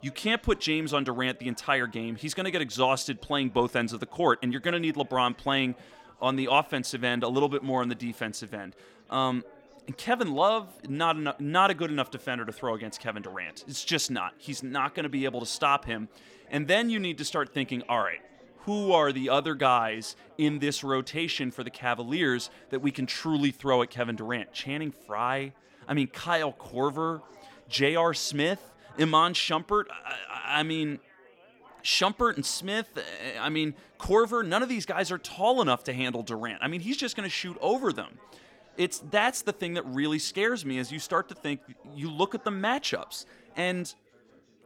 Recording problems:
chatter from many people; faint; throughout; 25 dB below the speech

